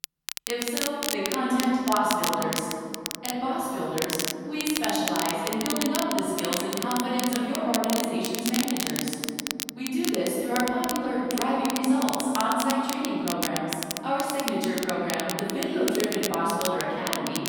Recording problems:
room echo; strong; dies away in 2.6 s
off-mic speech; far
crackle, like an old record; loud; 5 dB below the speech

